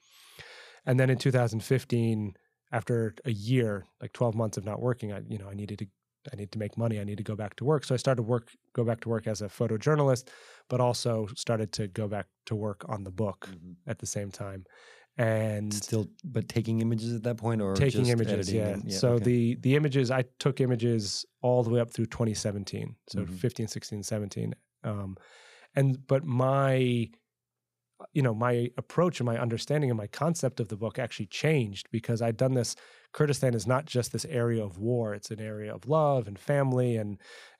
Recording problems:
none

